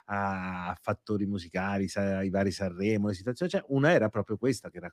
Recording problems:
none

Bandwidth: 15 kHz